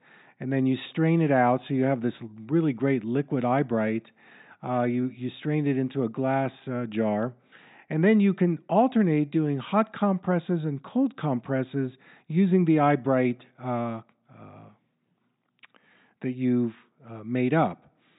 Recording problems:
high frequencies cut off; severe; nothing above 4 kHz

